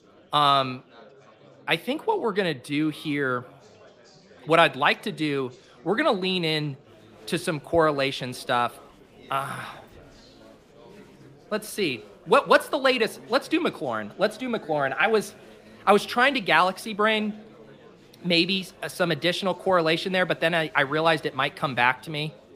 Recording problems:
chatter from many people; faint; throughout; 25 dB below the speech

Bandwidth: 15 kHz